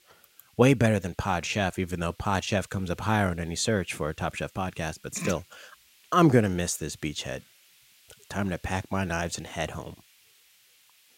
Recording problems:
hiss; faint; throughout; 30 dB below the speech

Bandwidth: 16 kHz